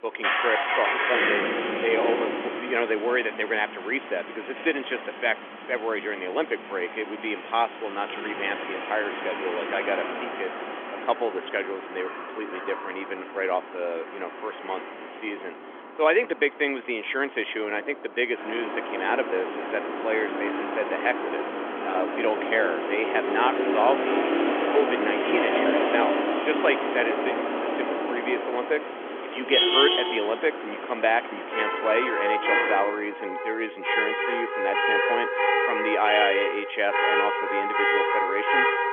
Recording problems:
phone-call audio; nothing above 3.5 kHz
traffic noise; very loud; throughout; 1 dB above the speech

